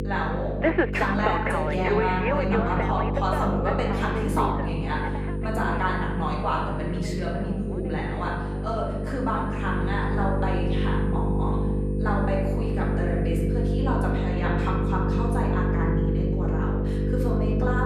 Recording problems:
off-mic speech; far
room echo; noticeable; dies away in 1 s
electrical hum; loud; throughout; 50 Hz, 5 dB below the speech
alarms or sirens; loud; throughout; as loud as the speech
high-pitched whine; faint; from 4.5 to 14 s; 9 kHz, 35 dB below the speech
abrupt cut into speech; at the end

